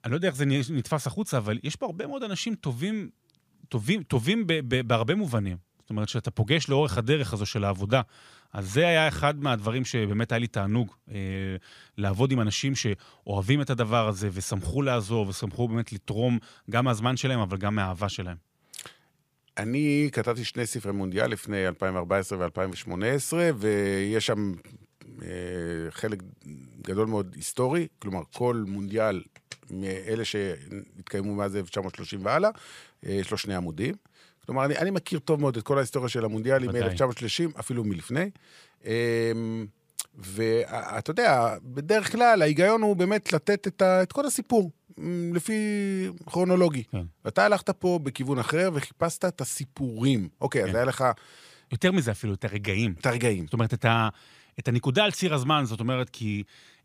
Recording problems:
none

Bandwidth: 15 kHz